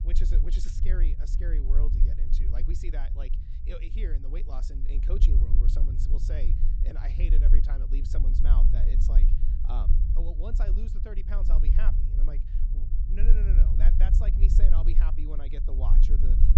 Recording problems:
high frequencies cut off; noticeable; nothing above 8 kHz
low rumble; loud; throughout; 3 dB below the speech

